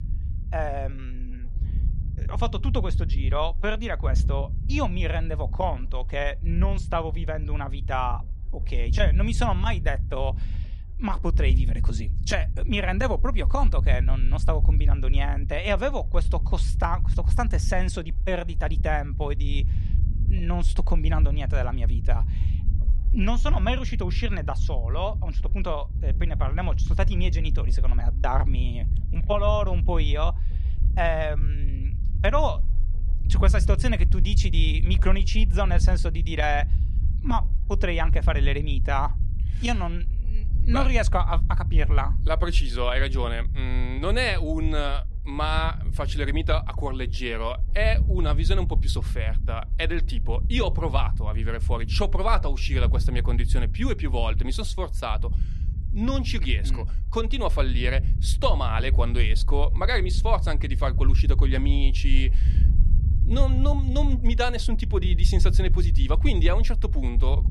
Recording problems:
low rumble; noticeable; throughout; 15 dB below the speech

